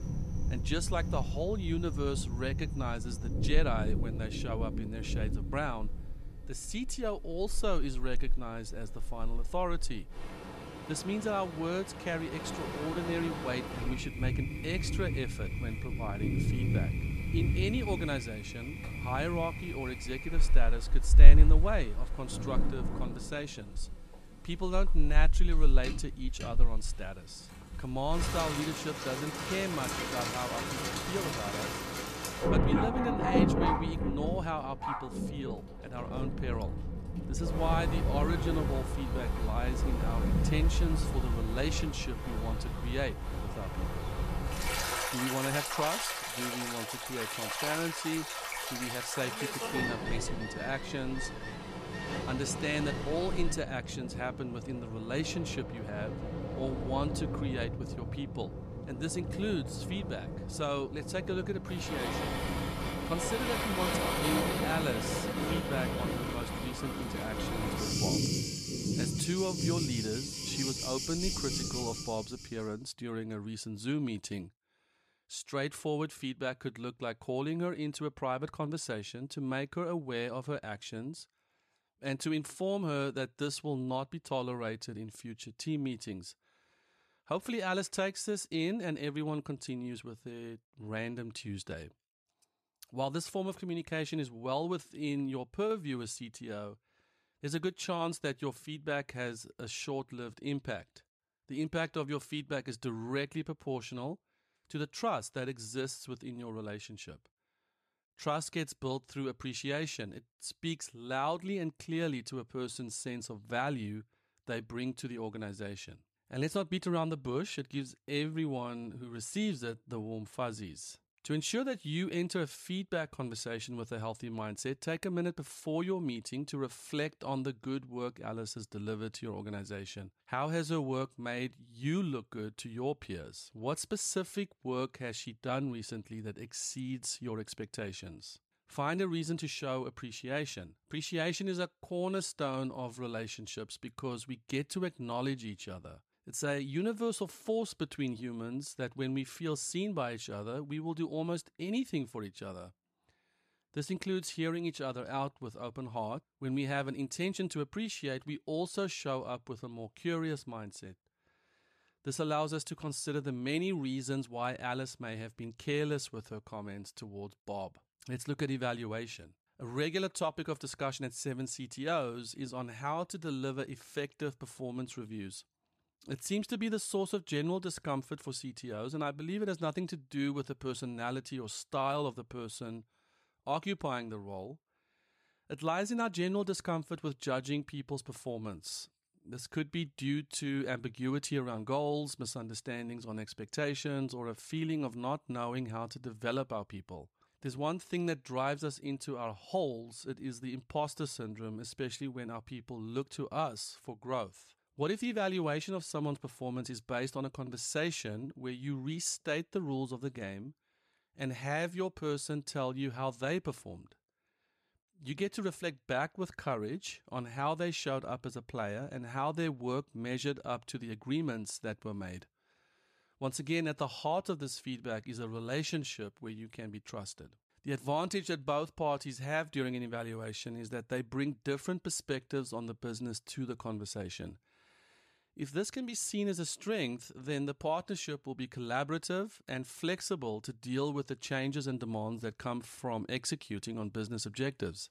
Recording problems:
rain or running water; very loud; until 1:12; 3 dB above the speech

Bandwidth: 14.5 kHz